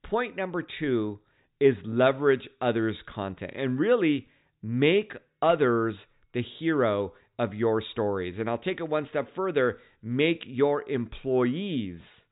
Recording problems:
high frequencies cut off; severe; nothing above 4 kHz

